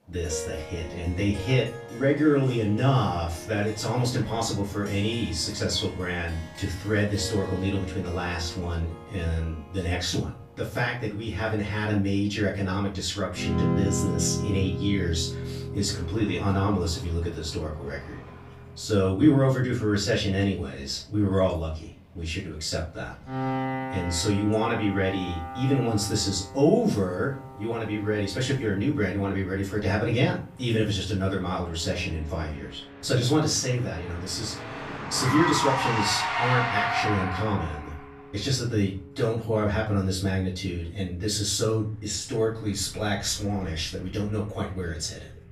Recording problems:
off-mic speech; far
room echo; slight; dies away in 0.3 s
traffic noise; loud; throughout; 6 dB below the speech
background music; noticeable; throughout; 10 dB below the speech

